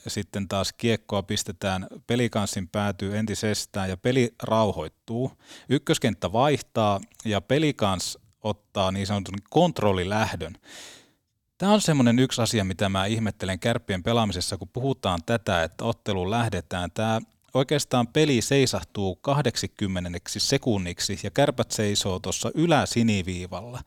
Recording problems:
none

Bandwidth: 18.5 kHz